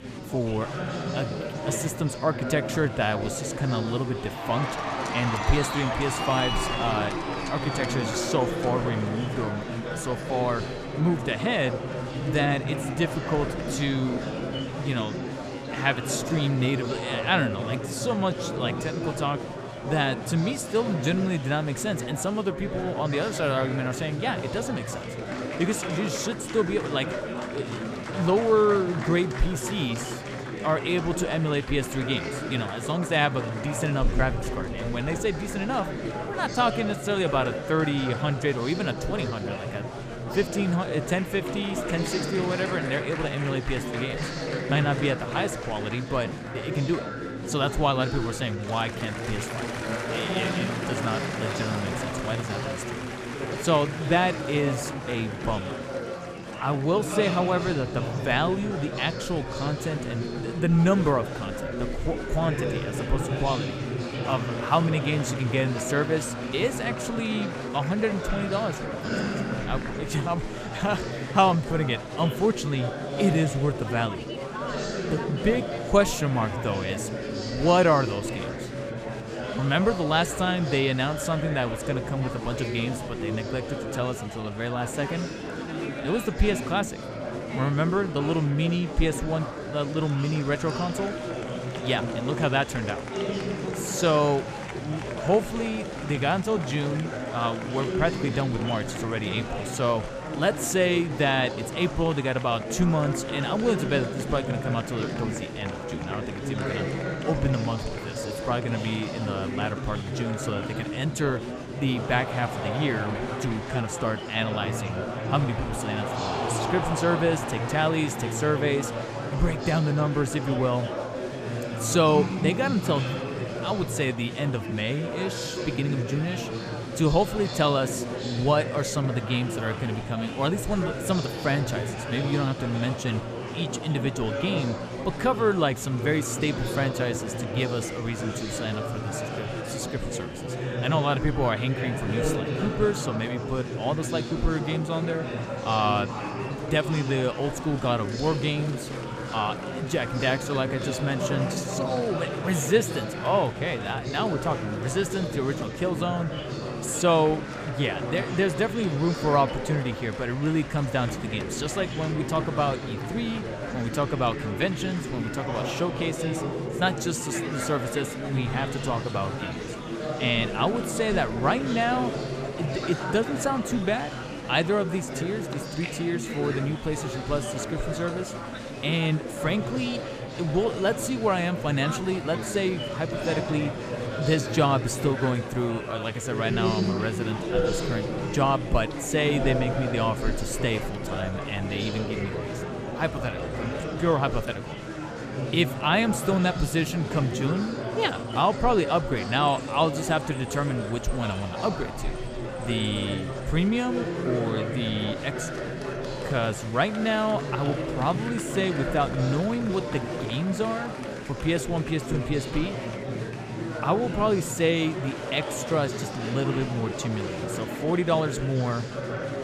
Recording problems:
murmuring crowd; loud; throughout; 5 dB below the speech

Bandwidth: 14.5 kHz